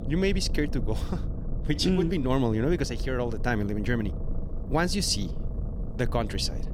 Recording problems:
low rumble; noticeable; throughout; 15 dB below the speech

